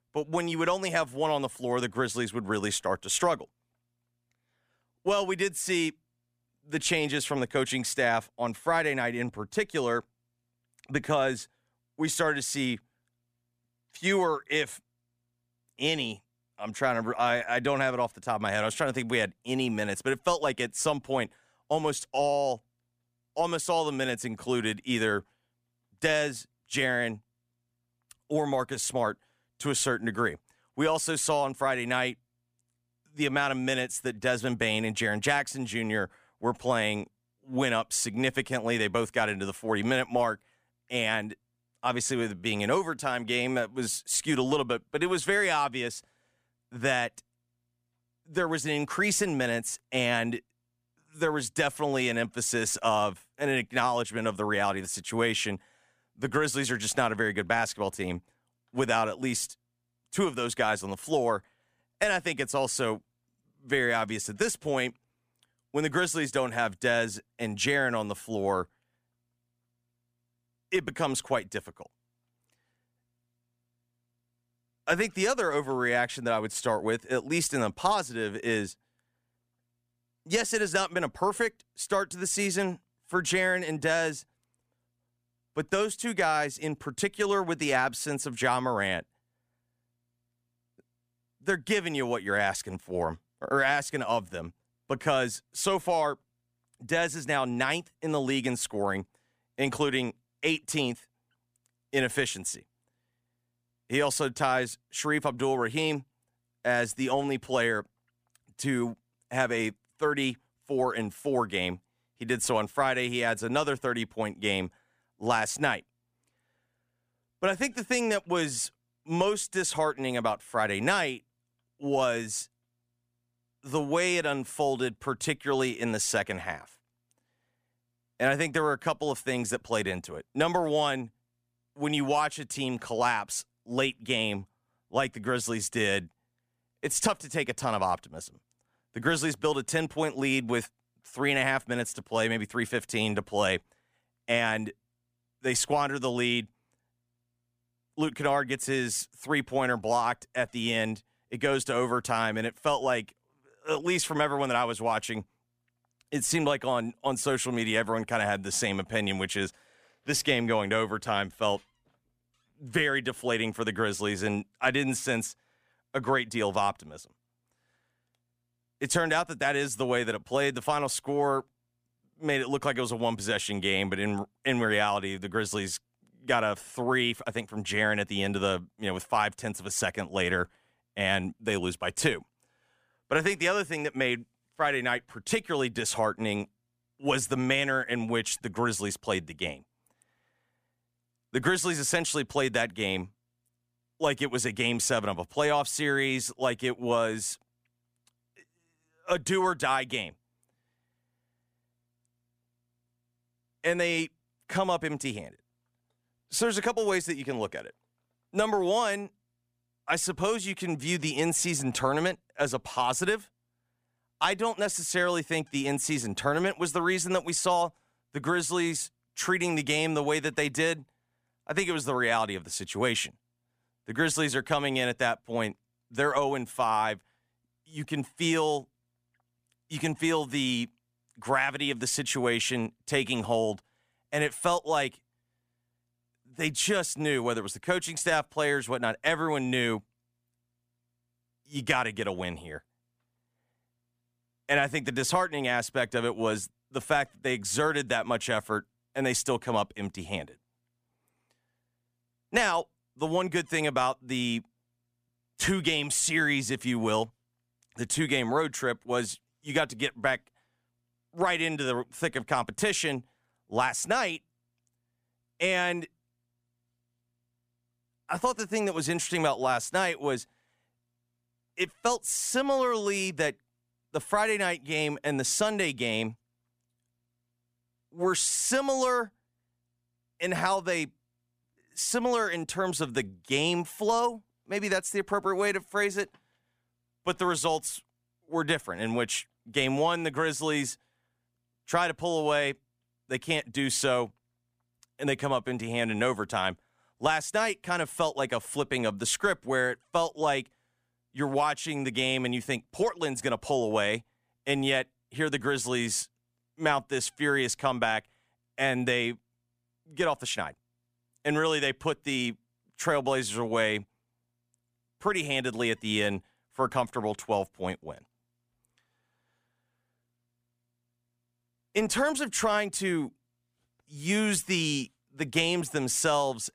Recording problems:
none

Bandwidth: 15 kHz